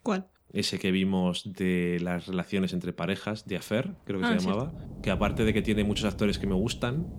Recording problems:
rain or running water; loud; throughout; 9 dB below the speech

